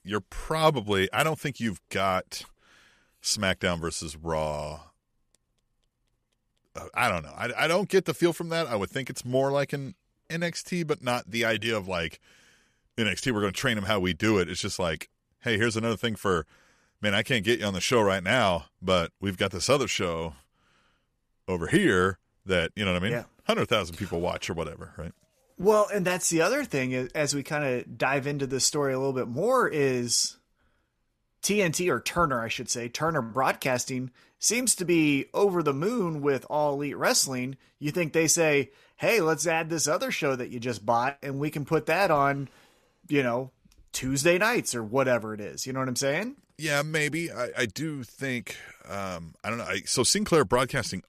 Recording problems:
none

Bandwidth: 14.5 kHz